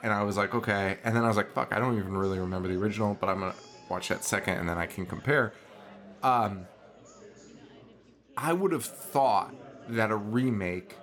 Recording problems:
chatter from many people; faint; throughout; 20 dB below the speech

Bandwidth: 18.5 kHz